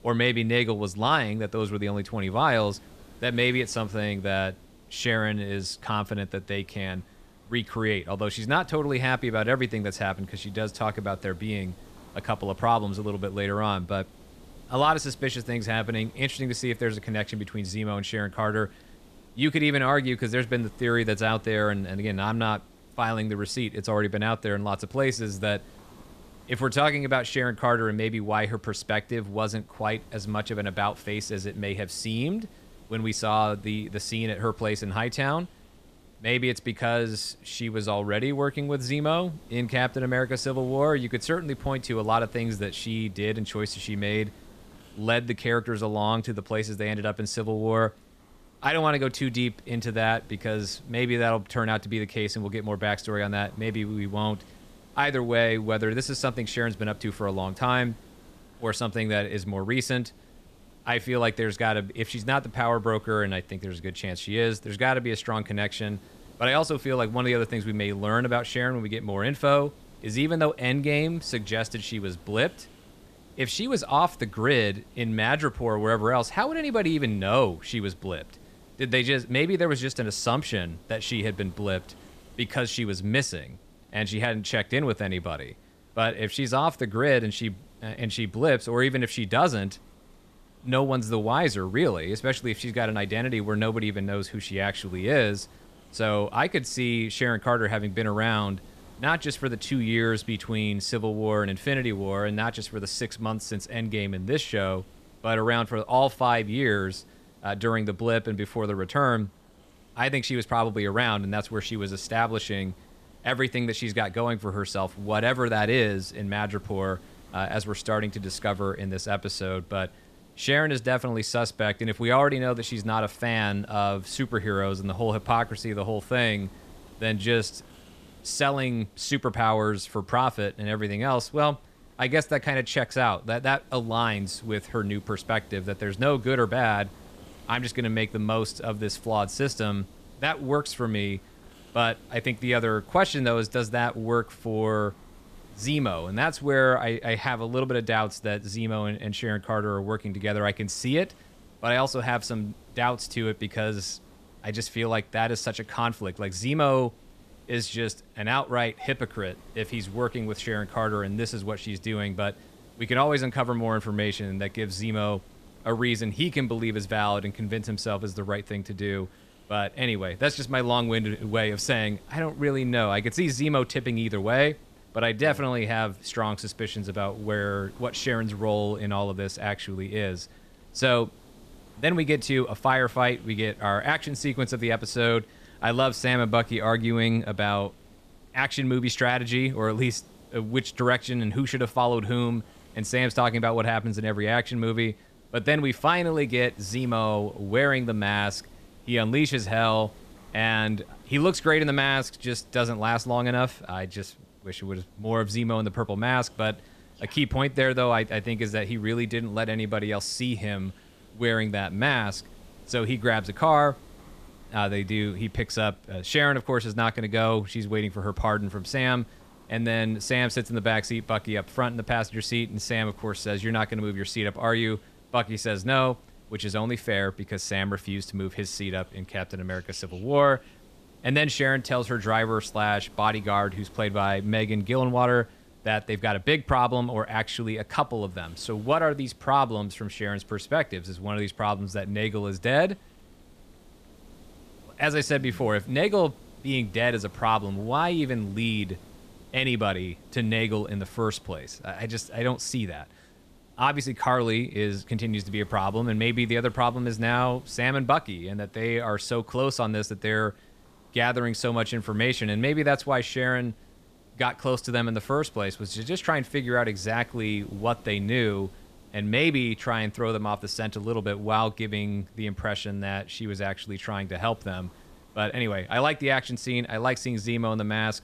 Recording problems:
hiss; faint; throughout; 25 dB below the speech

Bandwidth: 14.5 kHz